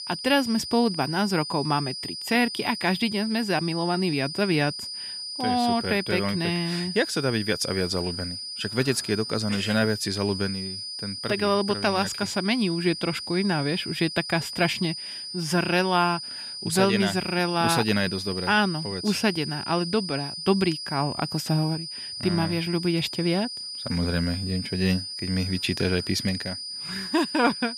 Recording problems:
high-pitched whine; loud; throughout; 5 kHz, 7 dB below the speech

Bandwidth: 14.5 kHz